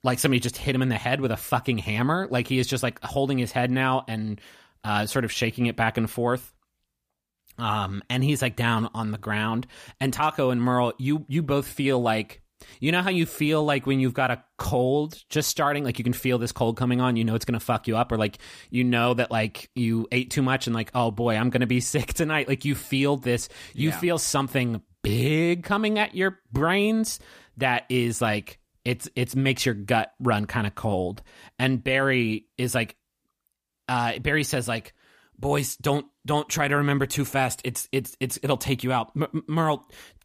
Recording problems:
none

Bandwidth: 15 kHz